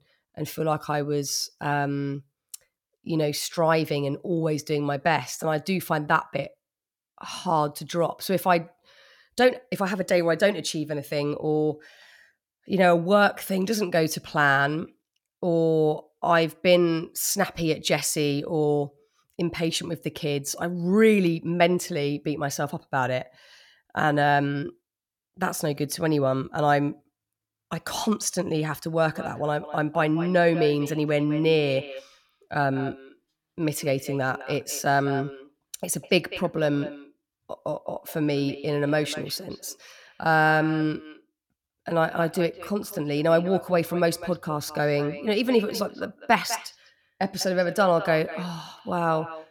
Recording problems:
echo of what is said; noticeable; from 29 s on; 200 ms later, 15 dB below the speech

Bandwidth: 17 kHz